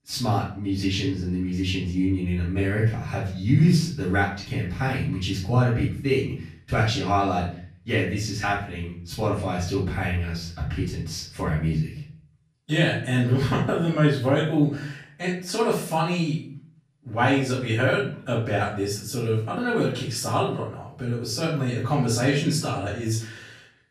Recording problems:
off-mic speech; far
room echo; noticeable; dies away in 0.4 s

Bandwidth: 14.5 kHz